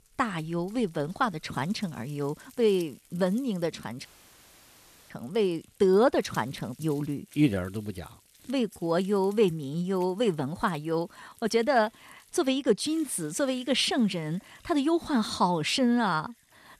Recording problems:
household noises; faint; throughout; 25 dB below the speech
audio cutting out; at 4 s for 1 s
uneven, jittery; slightly; from 7.5 to 15 s

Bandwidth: 14 kHz